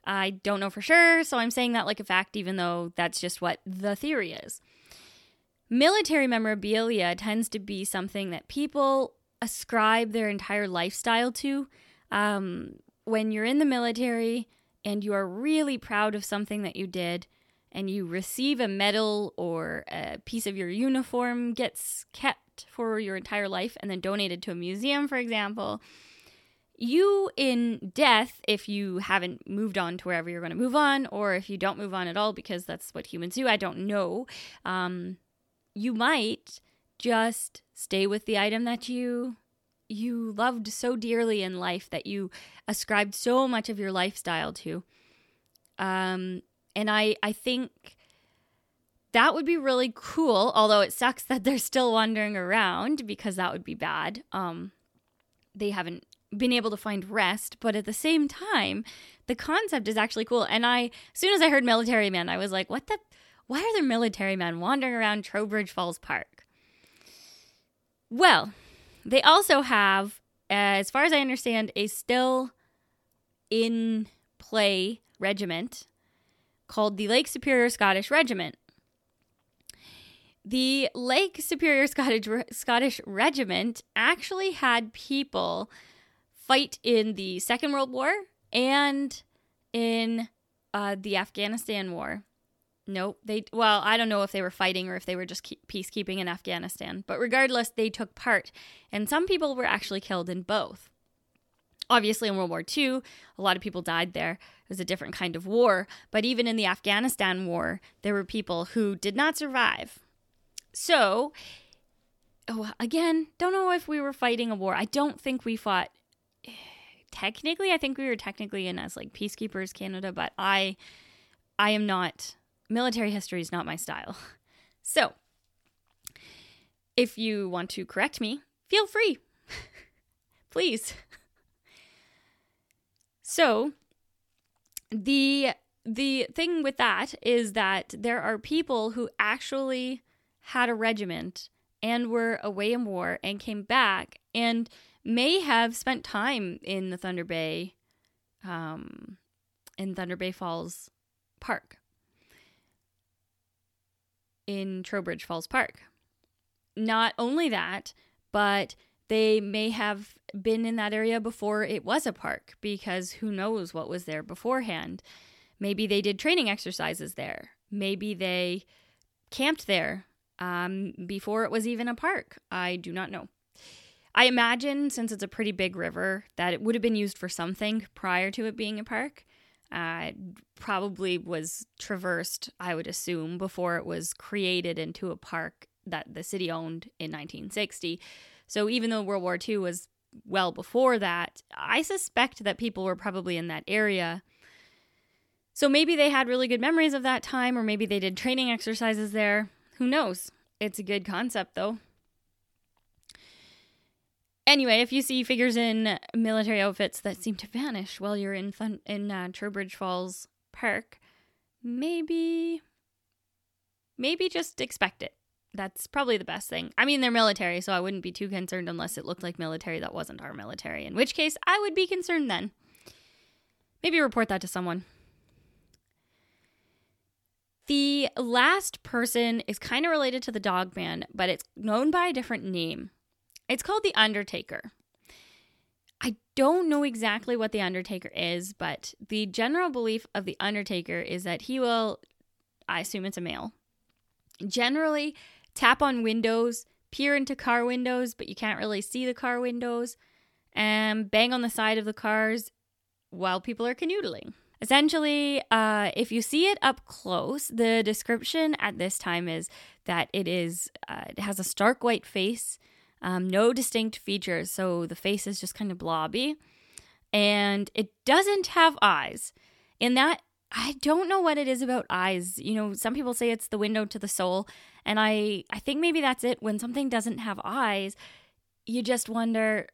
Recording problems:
none

